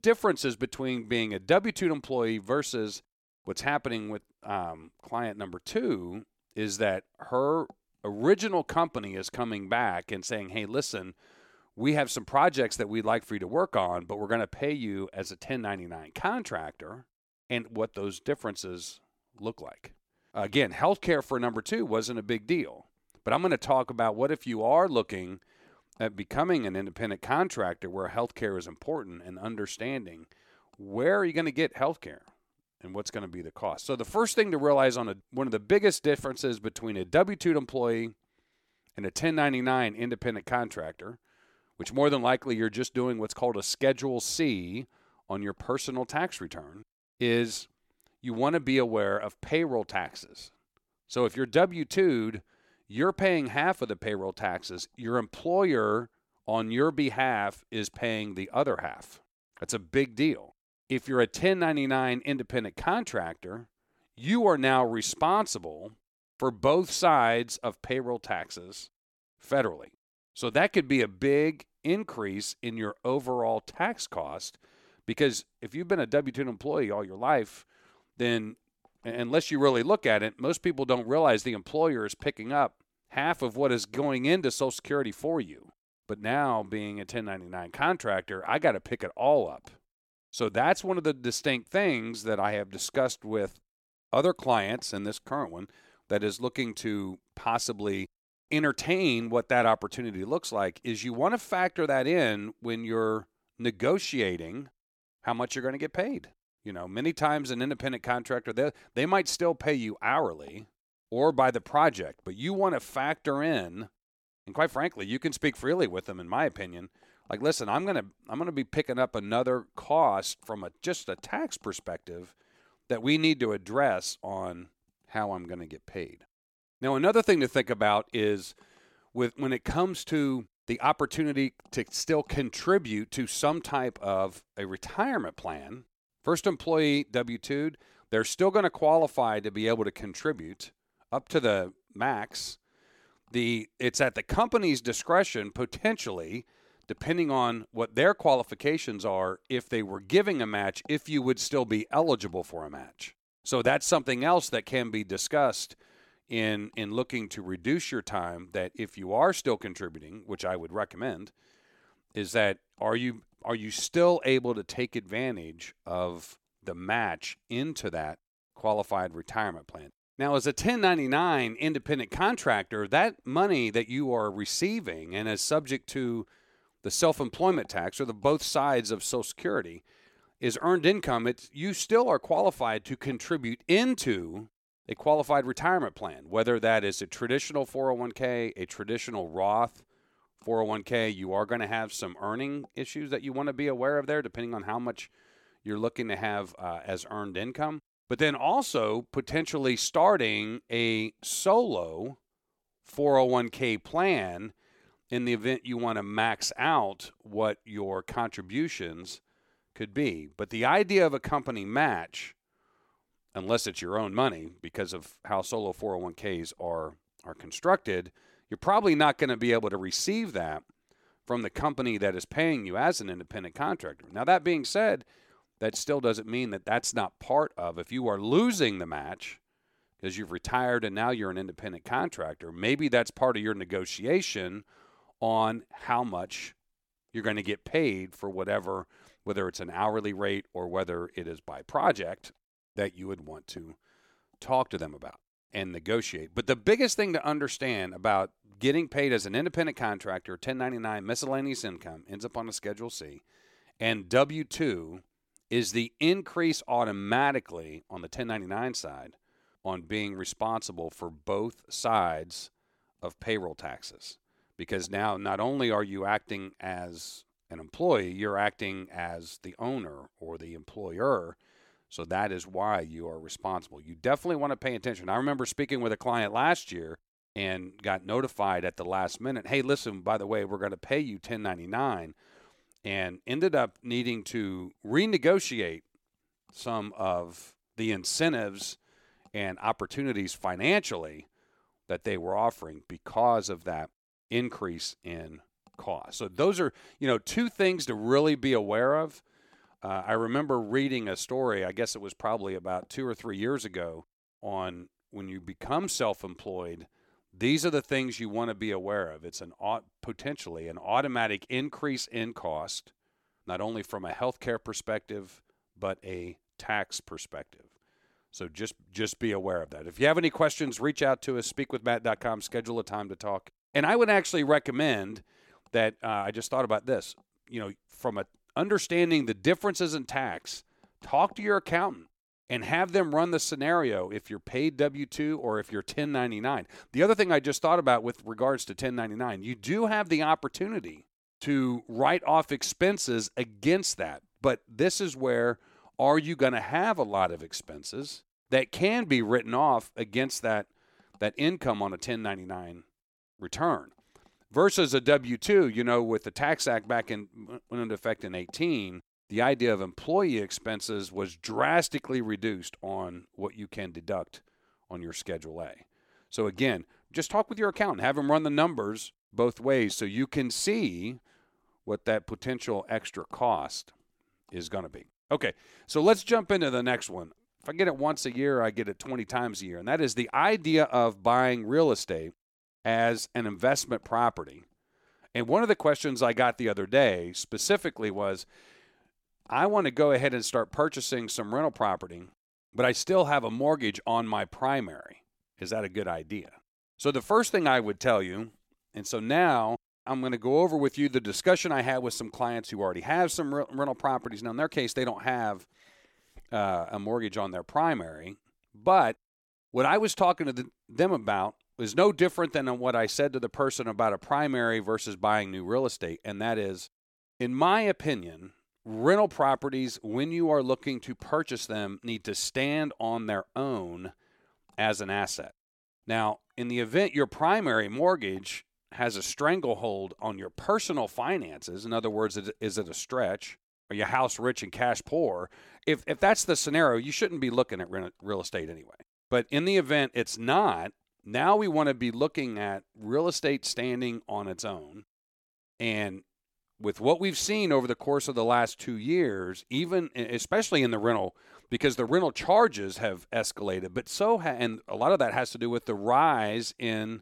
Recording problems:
none

